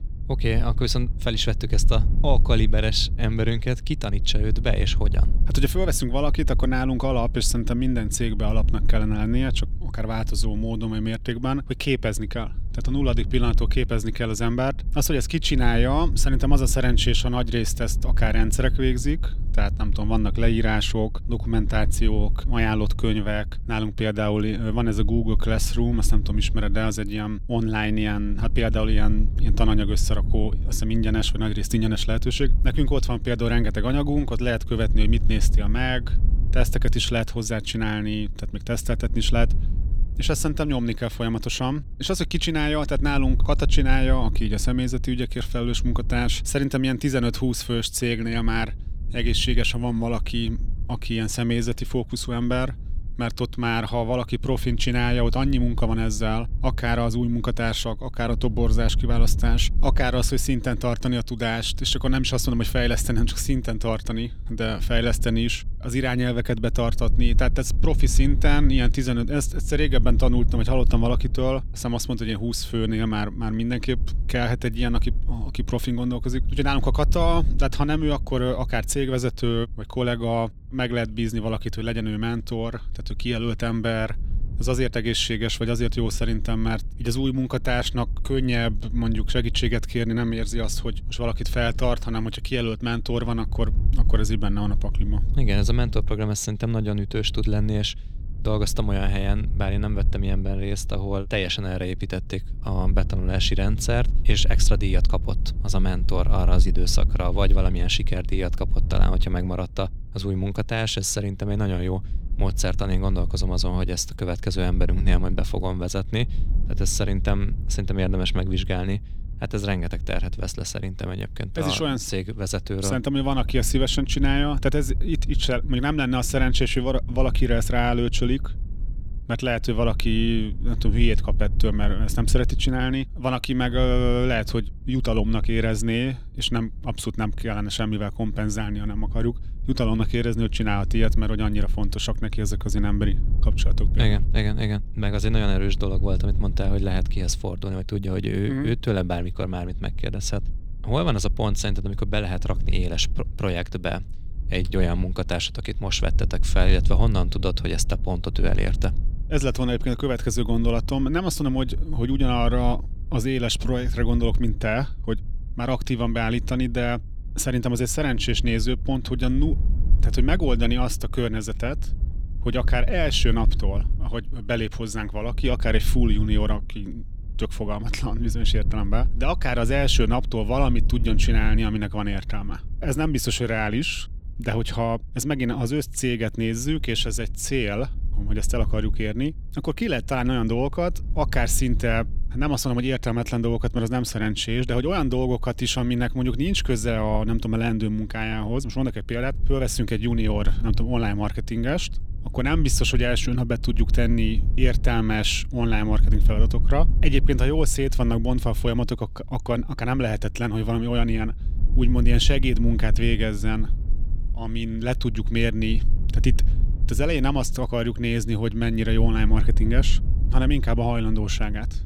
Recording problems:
low rumble; noticeable; throughout; 20 dB below the speech

